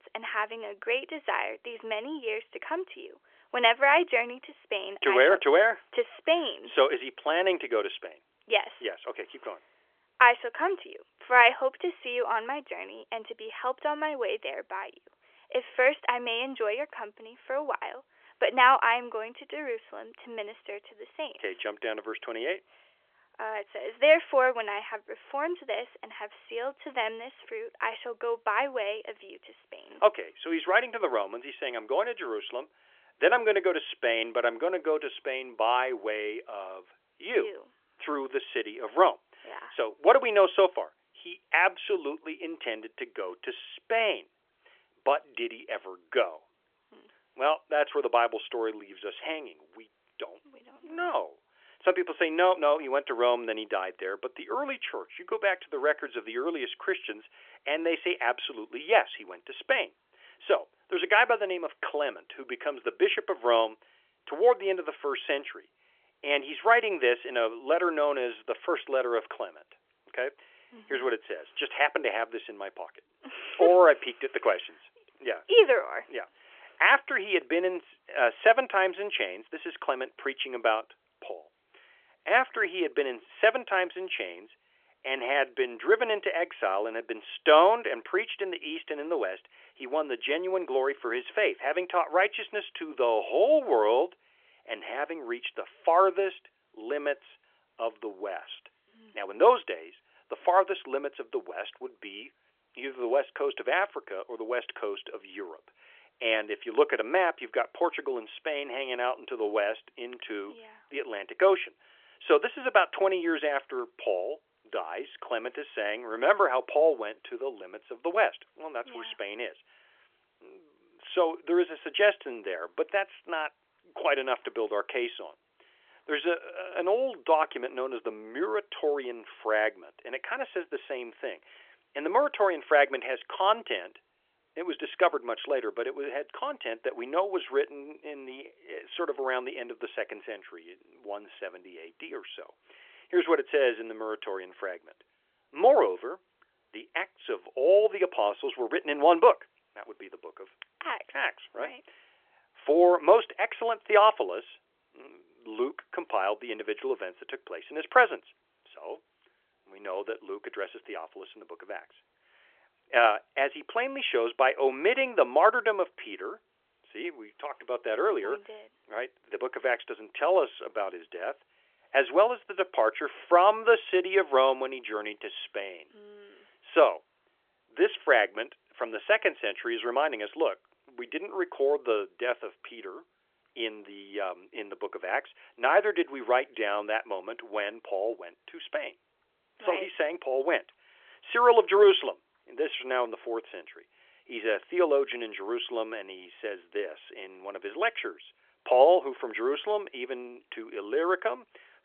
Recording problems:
phone-call audio; nothing above 3.5 kHz

